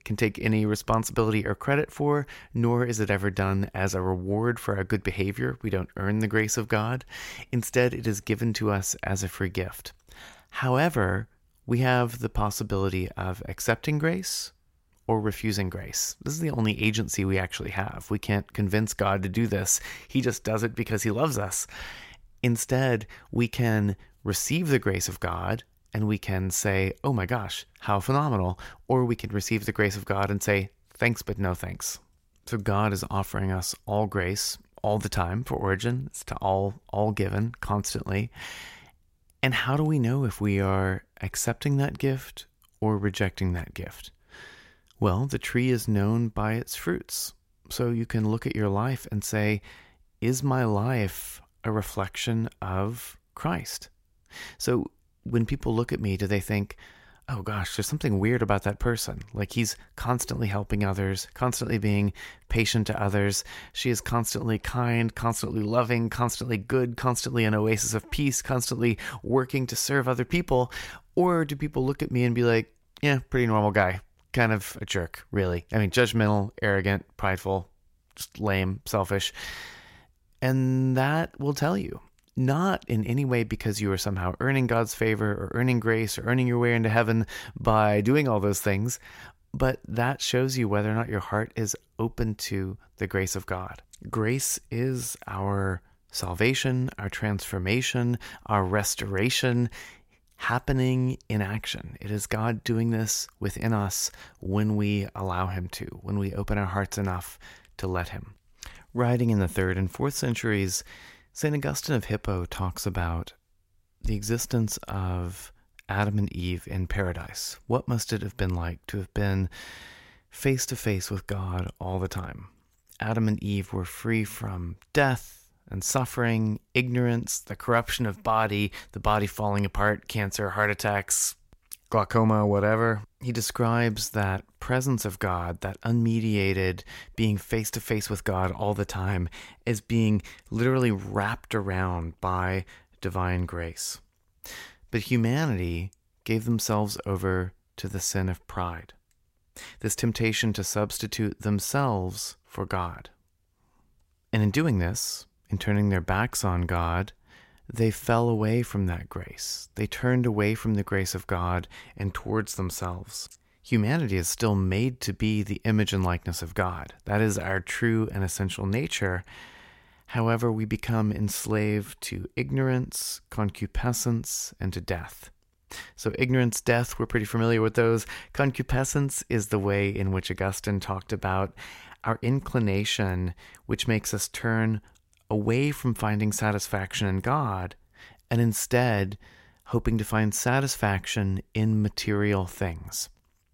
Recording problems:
none

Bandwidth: 16 kHz